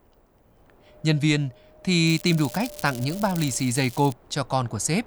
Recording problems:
wind noise on the microphone; occasional gusts; 20 dB below the speech
crackling; noticeable; from 2 to 4 s; 15 dB below the speech

